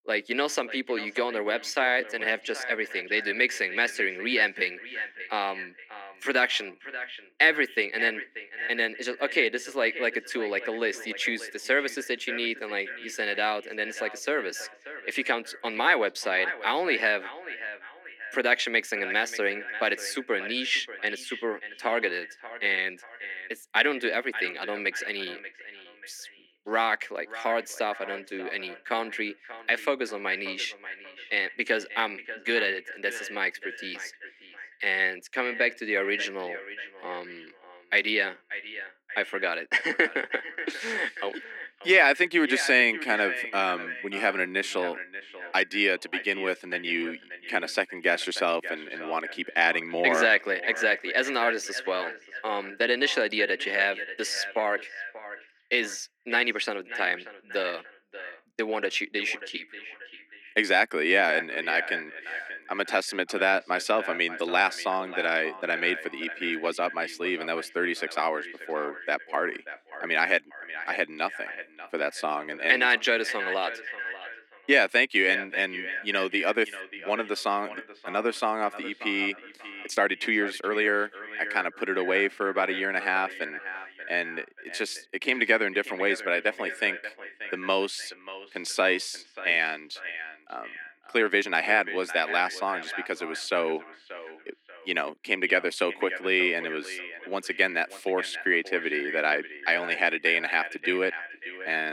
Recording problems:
echo of what is said; strong; throughout; 590 ms later, 10 dB below the speech
thin; somewhat; fading below 250 Hz
uneven, jittery; strongly; from 1.5 s to 1:32
abrupt cut into speech; at the end

